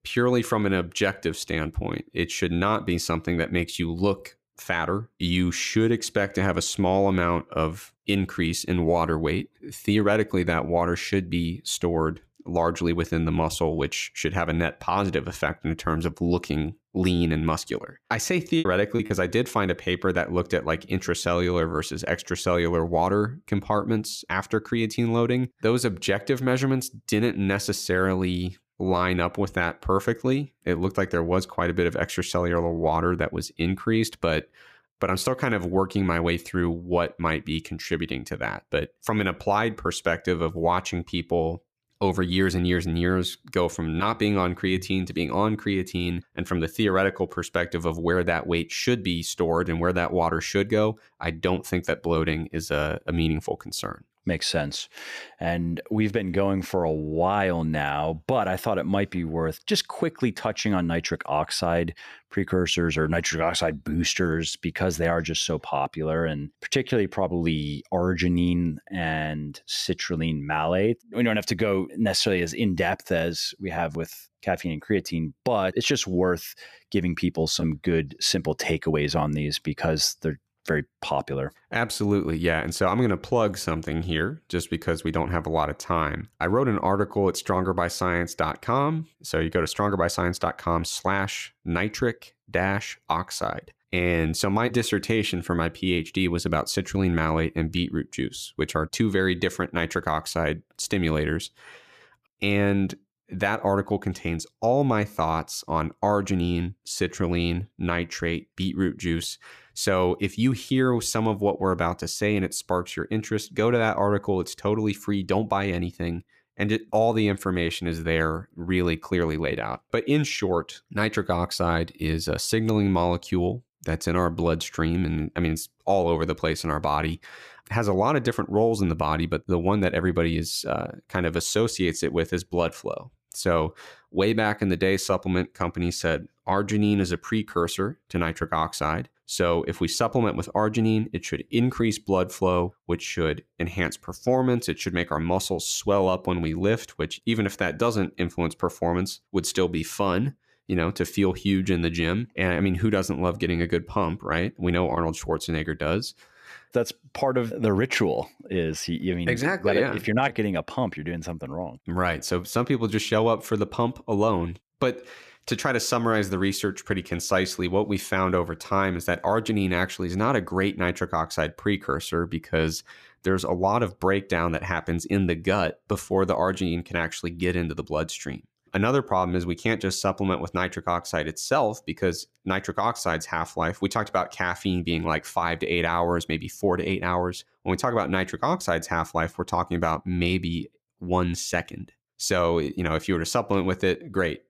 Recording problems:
choppy; very; from 18 to 19 s; 15% of the speech affected

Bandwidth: 14.5 kHz